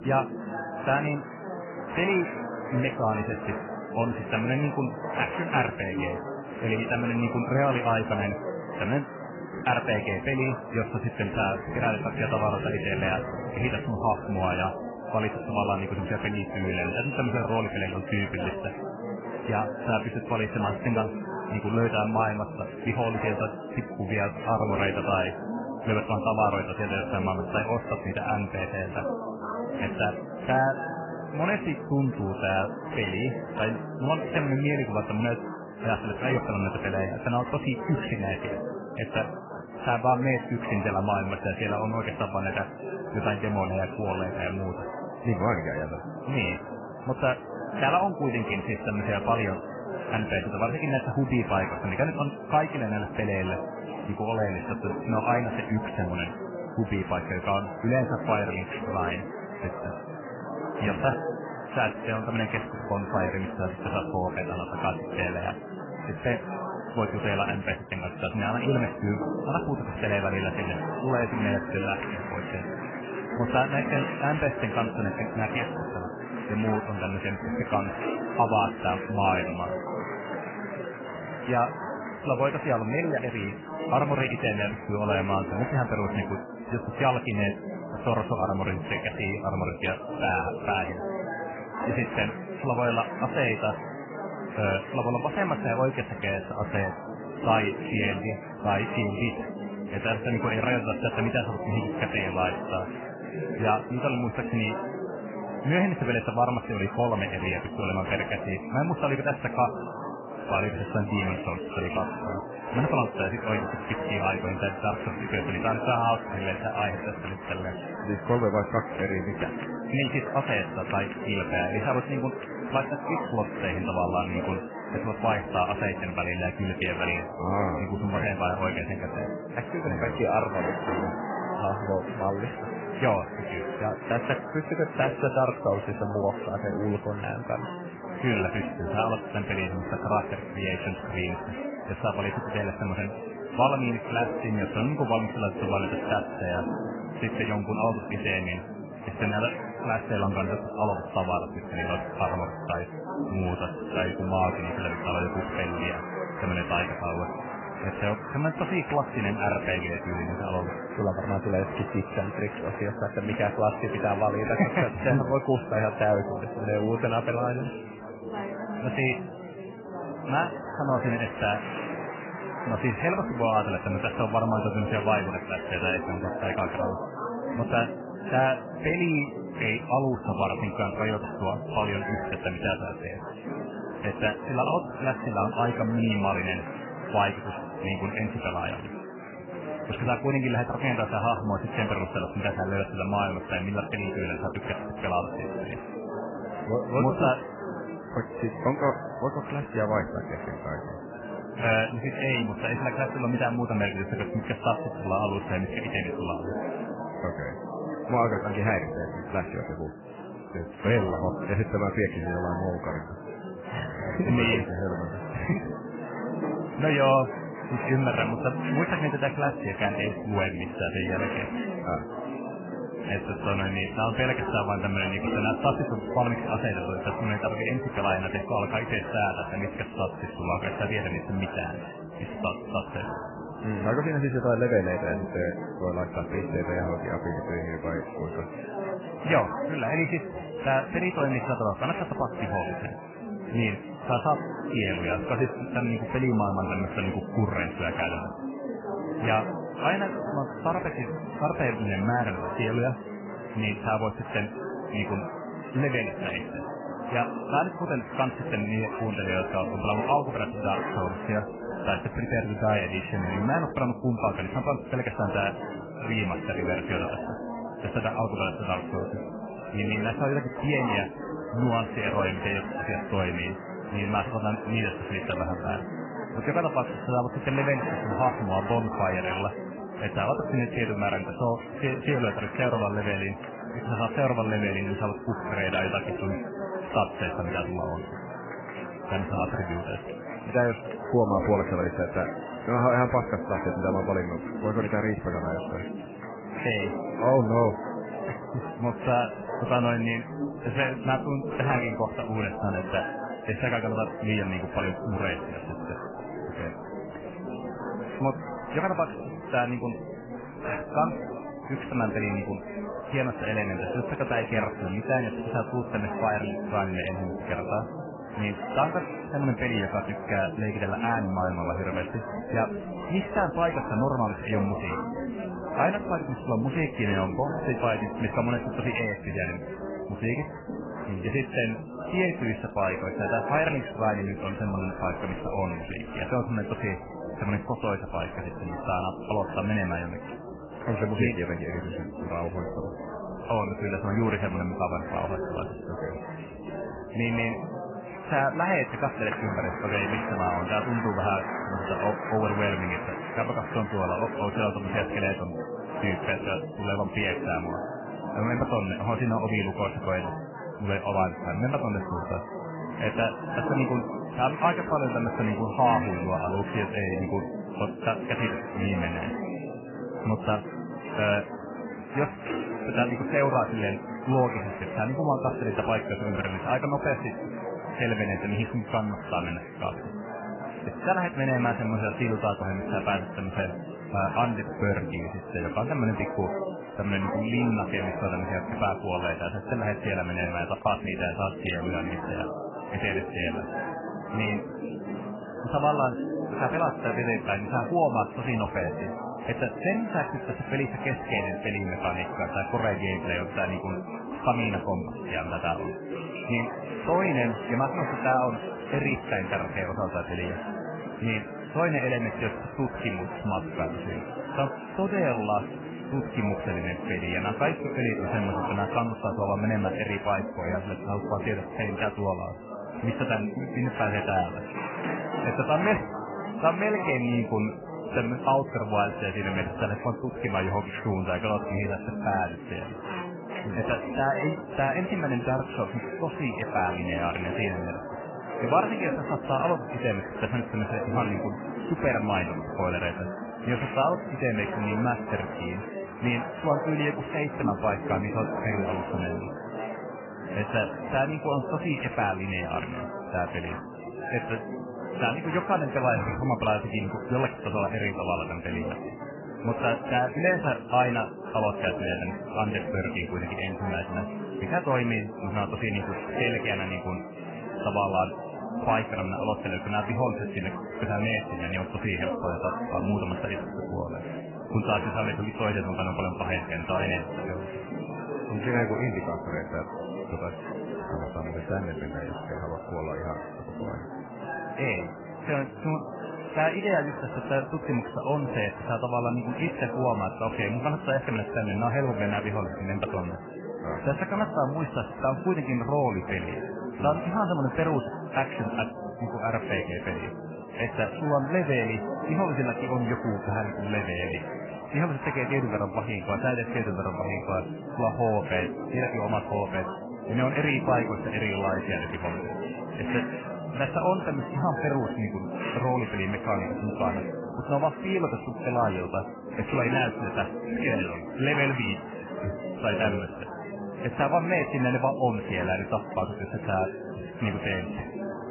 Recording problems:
garbled, watery; badly; nothing above 3 kHz
chatter from many people; loud; throughout; 6 dB below the speech
footsteps; faint; from 5:06 to 5:13; peak 15 dB below the speech

